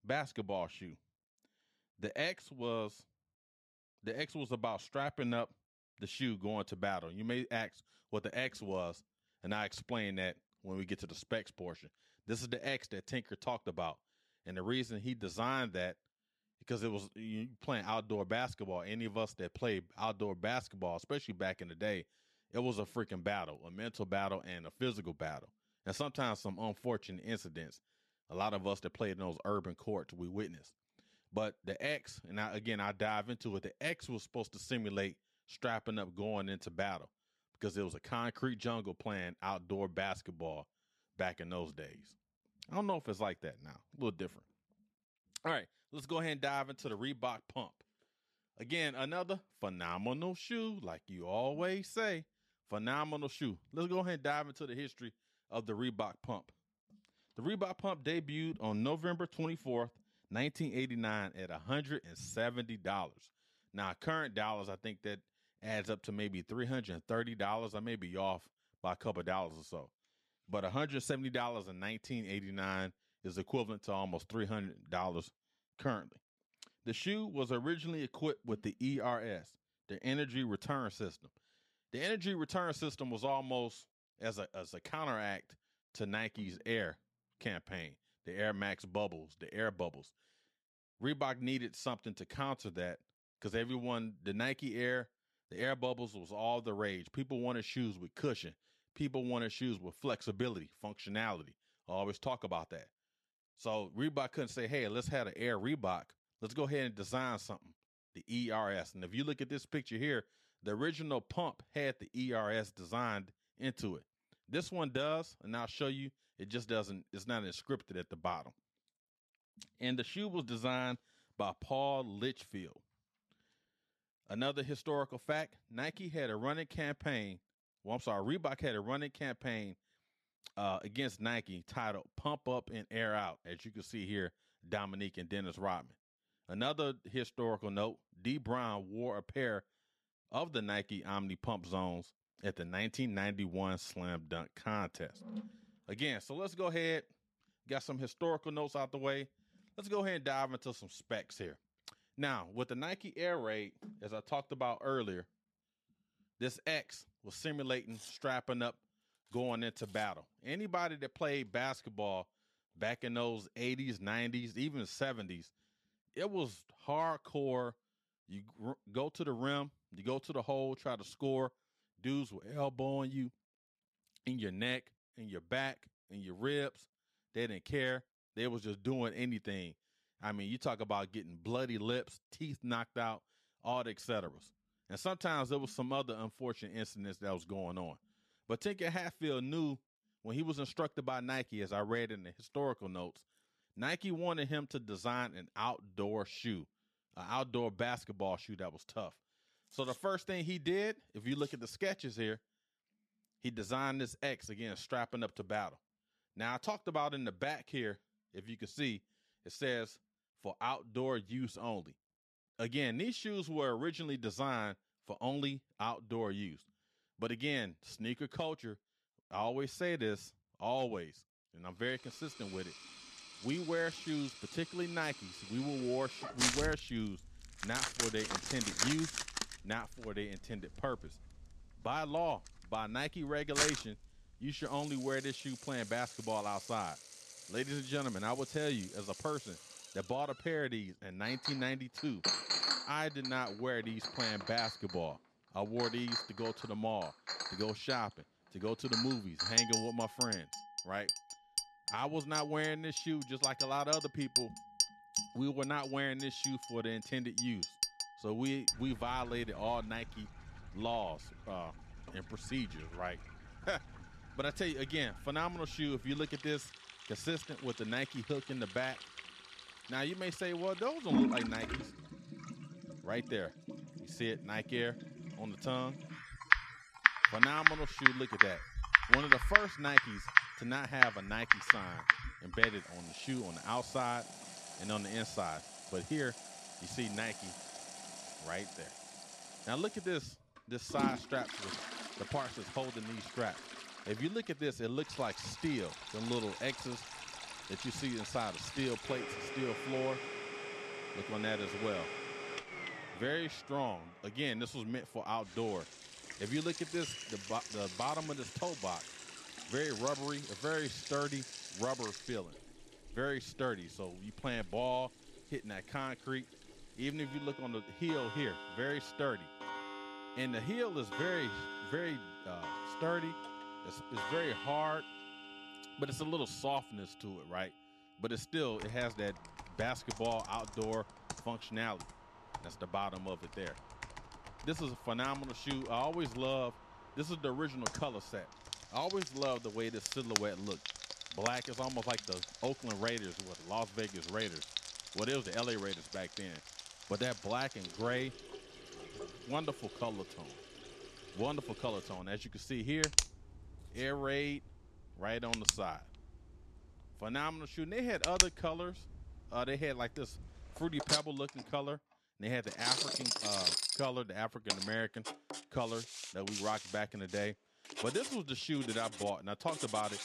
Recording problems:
household noises; very loud; from 3:42 on; 3 dB above the speech

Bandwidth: 13.5 kHz